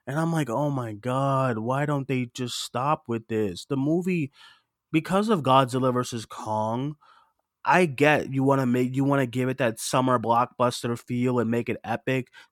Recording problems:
none

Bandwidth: 17.5 kHz